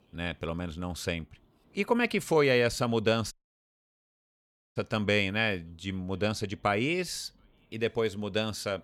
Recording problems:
audio cutting out; at 3.5 s for 1.5 s

